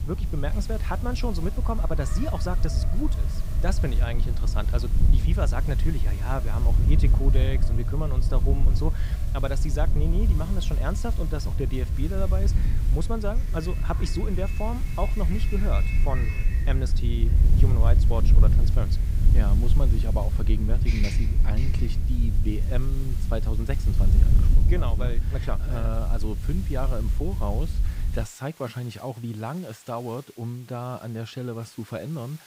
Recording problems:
wind noise on the microphone; heavy; until 28 s; 8 dB below the speech
traffic noise; noticeable; until 22 s; 15 dB below the speech
hiss; noticeable; throughout; 15 dB below the speech

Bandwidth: 15.5 kHz